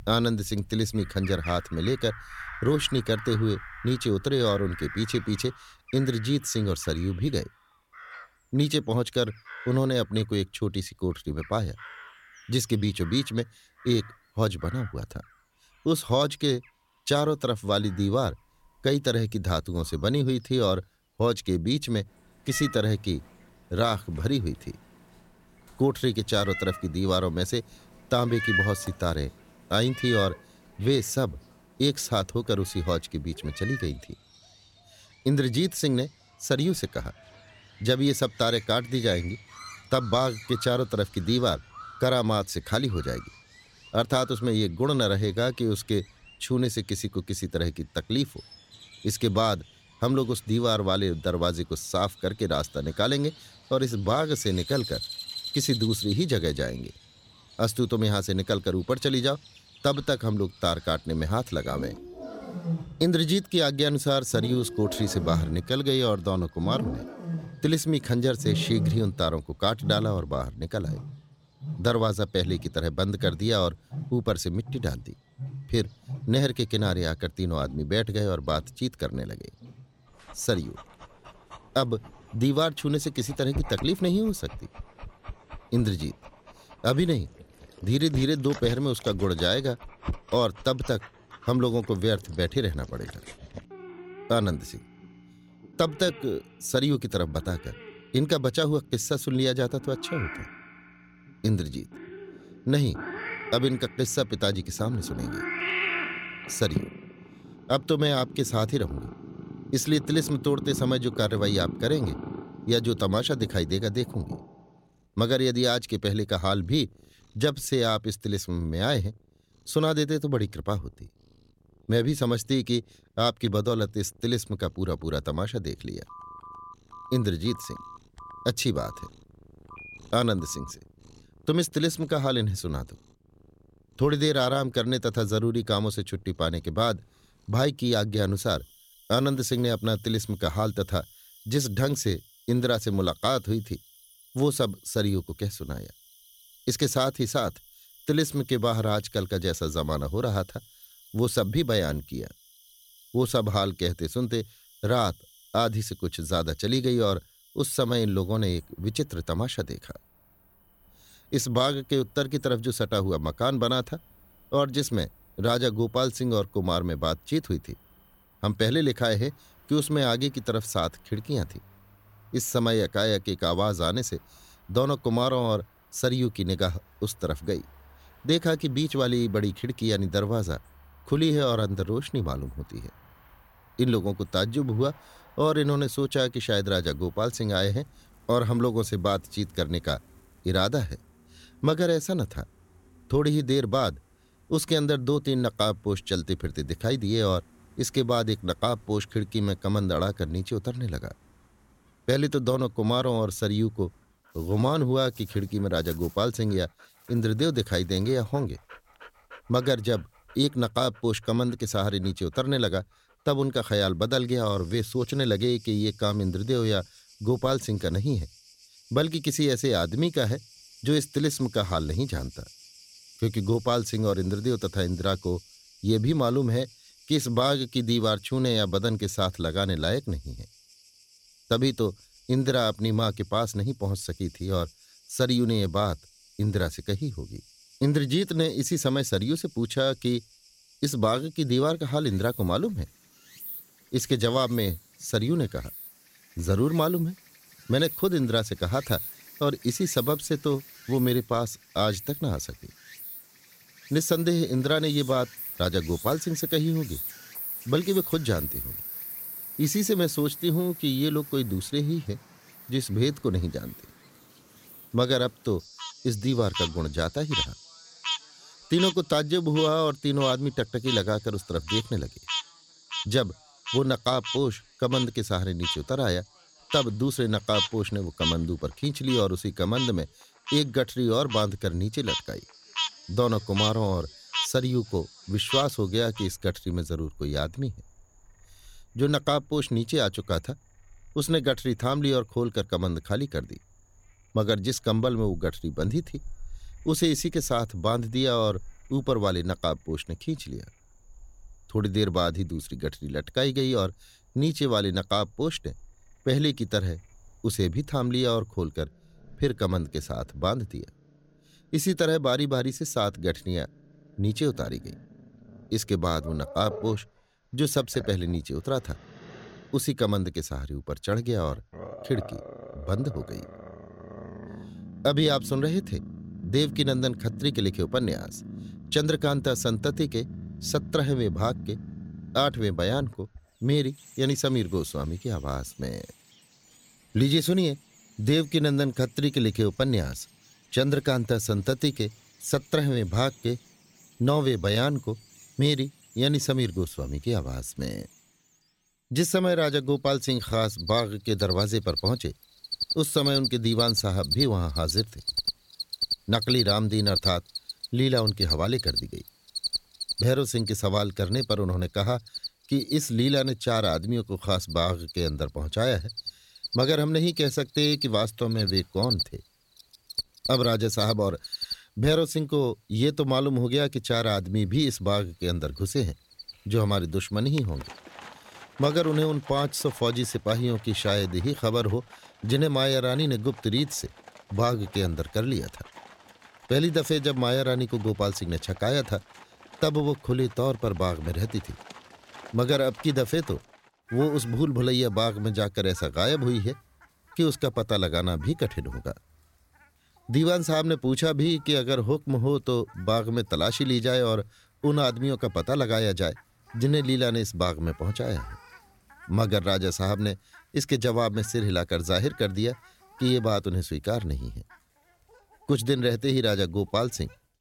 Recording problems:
animal sounds; loud; throughout; 9 dB below the speech
phone ringing; faint; from 2:06 to 2:11; peak 15 dB below the speech

